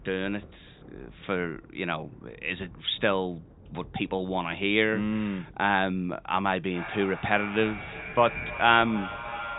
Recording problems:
echo of what is said; strong; from 6.5 s on; 310 ms later, 9 dB below the speech
high frequencies cut off; severe; nothing above 4 kHz
rain or running water; faint; throughout; 25 dB below the speech

